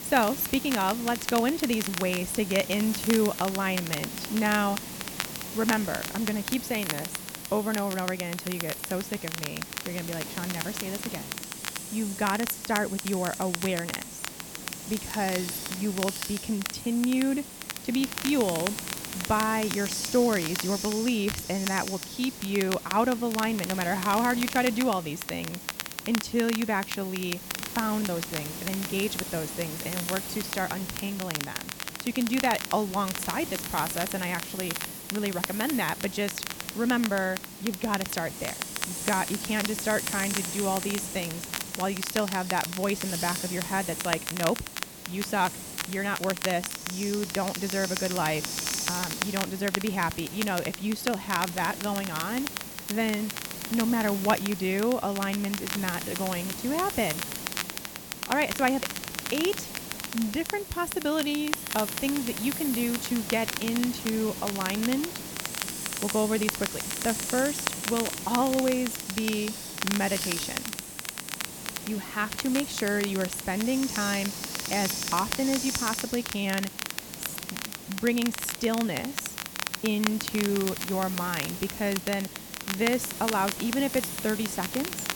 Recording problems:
hiss; loud; throughout; 6 dB below the speech
crackle, like an old record; loud; 6 dB below the speech

